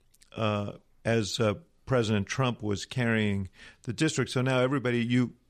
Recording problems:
none

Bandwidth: 14 kHz